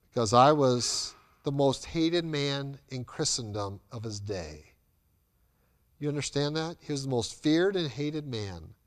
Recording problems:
none

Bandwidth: 15 kHz